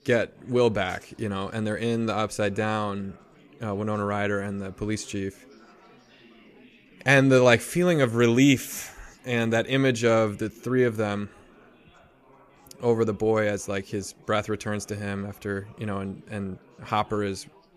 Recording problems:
chatter from many people; faint; throughout; 30 dB below the speech

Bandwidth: 14.5 kHz